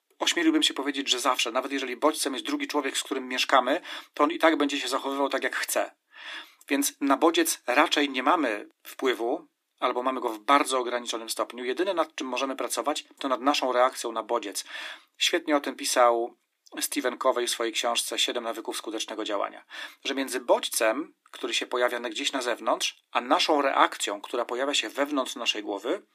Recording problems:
thin; somewhat; fading below 300 Hz

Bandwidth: 15 kHz